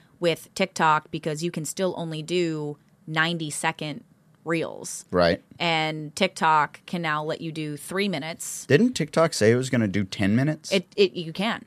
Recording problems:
none

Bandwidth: 14.5 kHz